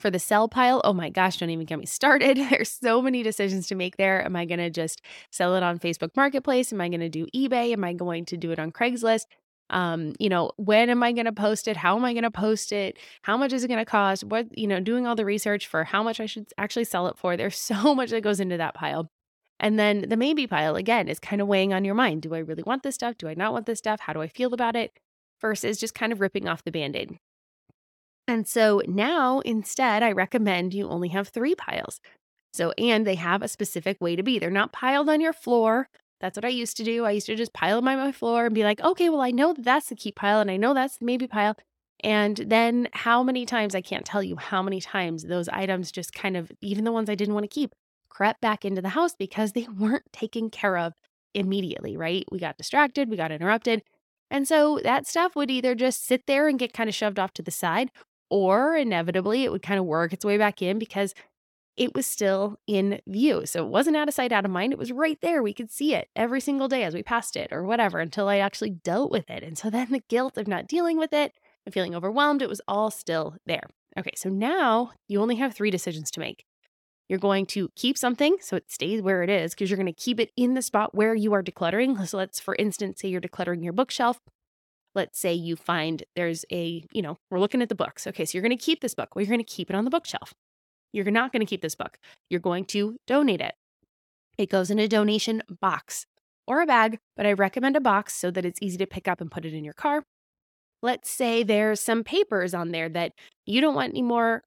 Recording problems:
none

